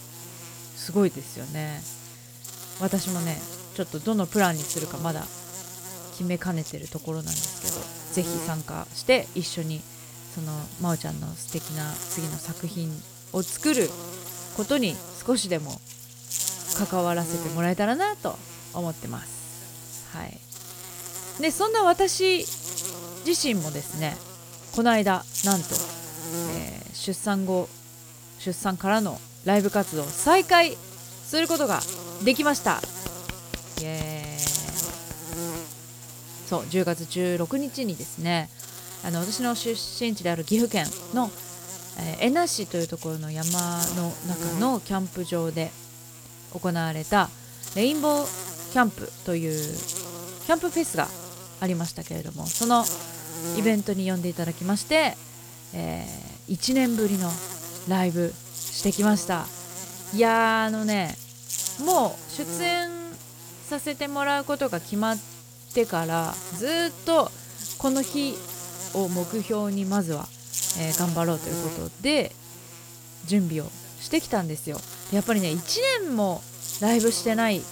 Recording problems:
electrical hum; loud; throughout; 60 Hz, 10 dB below the speech

